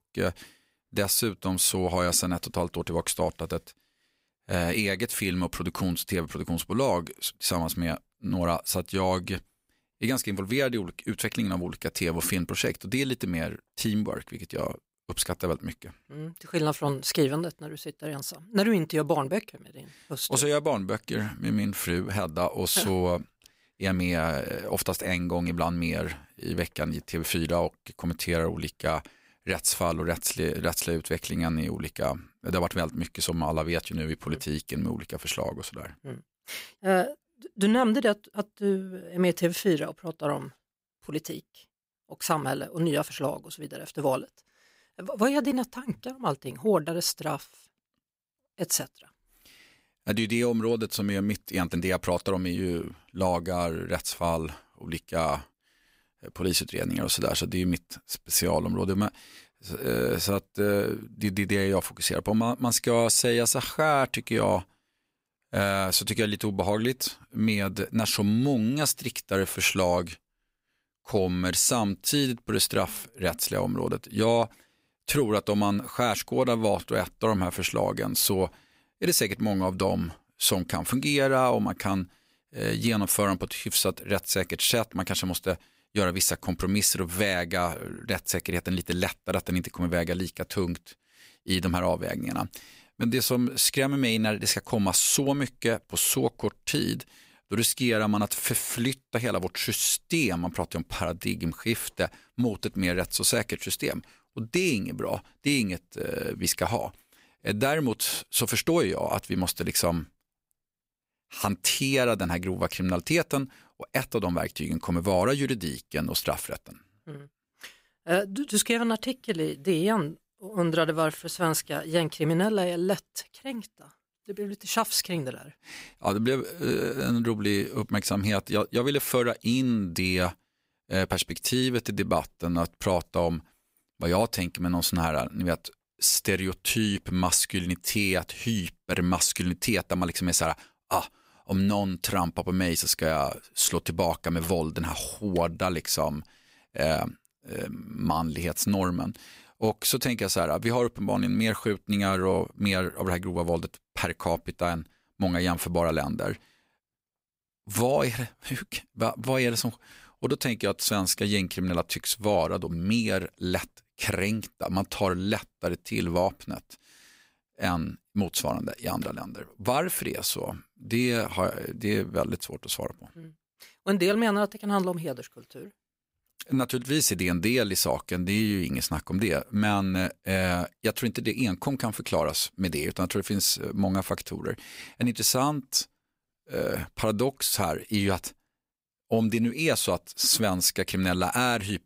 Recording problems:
none

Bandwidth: 15.5 kHz